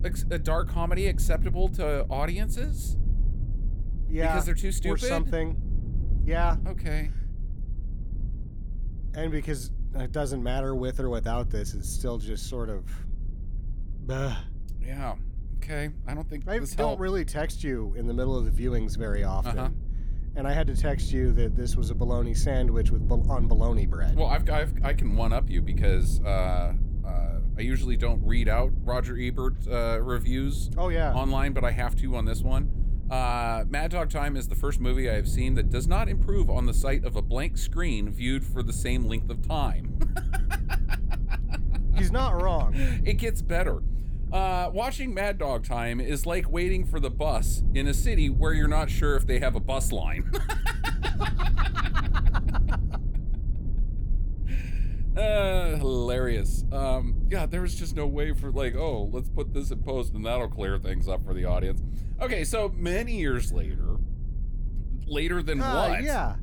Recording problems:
low rumble; noticeable; throughout; 15 dB below the speech

